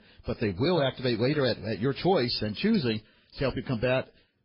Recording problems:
garbled, watery; badly; nothing above 5 kHz

